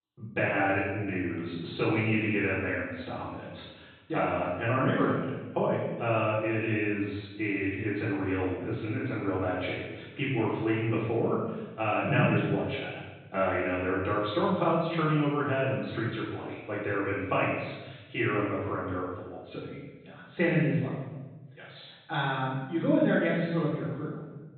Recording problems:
room echo; strong; dies away in 1.2 s
off-mic speech; far
high frequencies cut off; severe; nothing above 4 kHz

